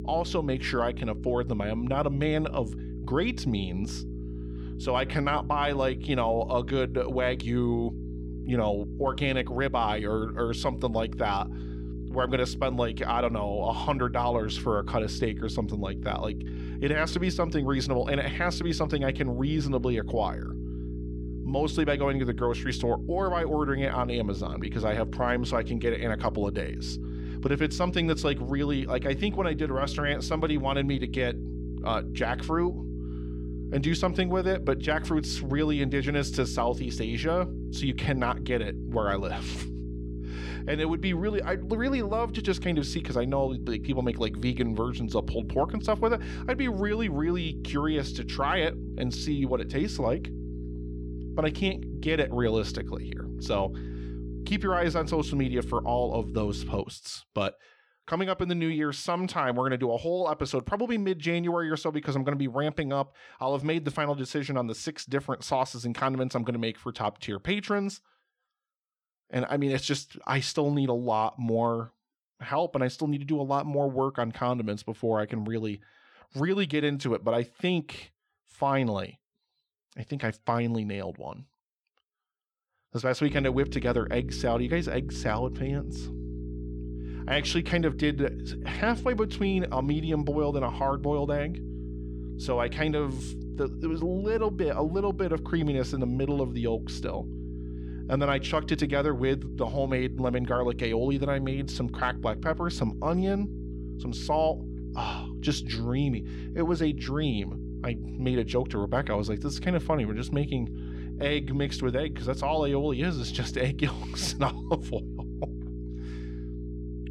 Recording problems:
electrical hum; noticeable; until 57 s and from 1:23 on; 60 Hz, 15 dB below the speech

